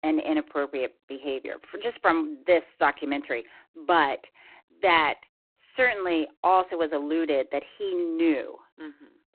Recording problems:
phone-call audio; poor line

